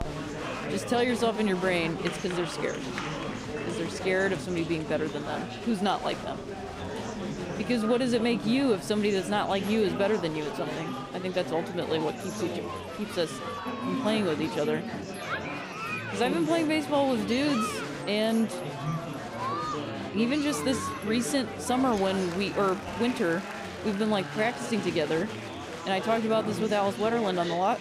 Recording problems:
chatter from many people; loud; throughout; 6 dB below the speech

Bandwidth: 15.5 kHz